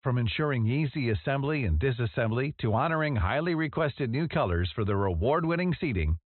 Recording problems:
high frequencies cut off; severe; nothing above 4 kHz

